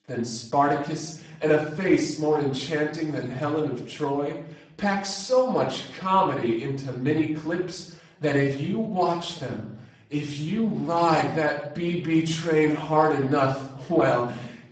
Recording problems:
off-mic speech; far
garbled, watery; badly; nothing above 8 kHz
room echo; noticeable; dies away in 0.6 s

